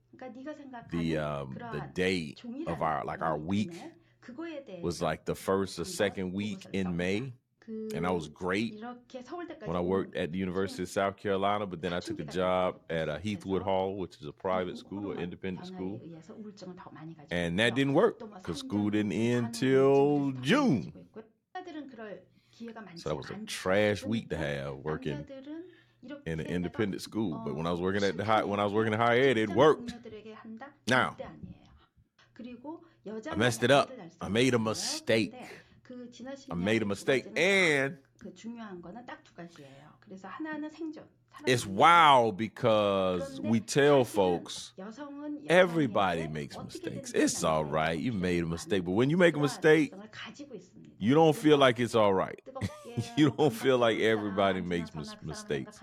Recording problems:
voice in the background; noticeable; throughout; 15 dB below the speech

